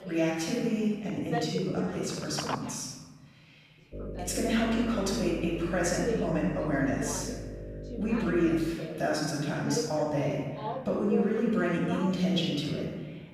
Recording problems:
room echo; strong; dies away in 1.5 s
off-mic speech; far
voice in the background; loud; throughout; 10 dB below the speech
electrical hum; noticeable; from 4 to 8.5 s; 50 Hz, 15 dB below the speech
phone ringing; noticeable; from 1 to 4 s; peak 7 dB below the speech

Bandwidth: 14.5 kHz